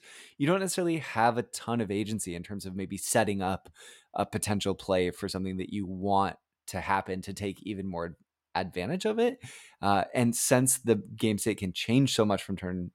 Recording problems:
none

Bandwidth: 16.5 kHz